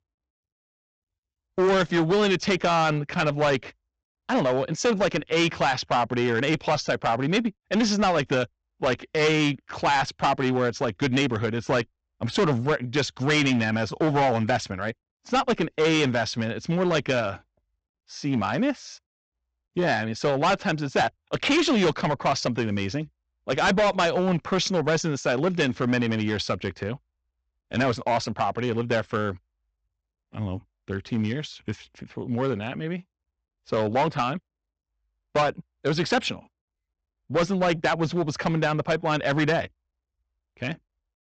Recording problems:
distortion; heavy; 8% of the sound clipped
high frequencies cut off; noticeable; nothing above 8 kHz

